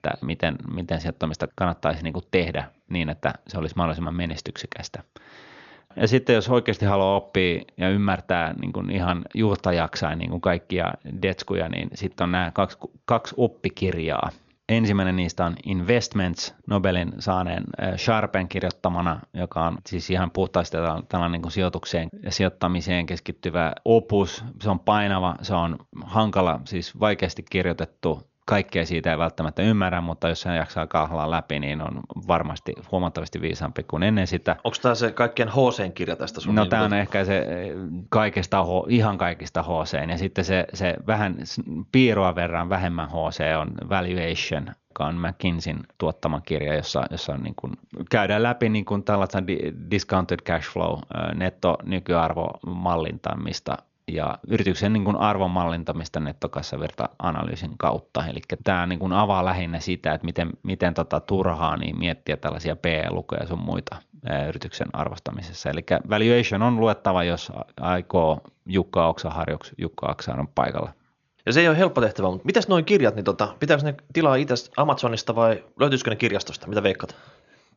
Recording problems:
high frequencies cut off; noticeable; nothing above 7 kHz

